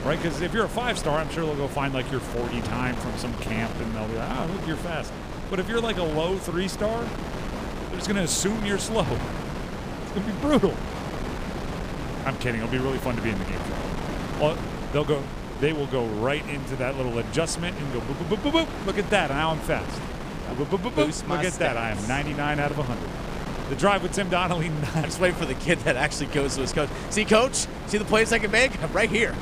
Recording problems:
wind noise on the microphone; heavy; 9 dB below the speech

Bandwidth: 15 kHz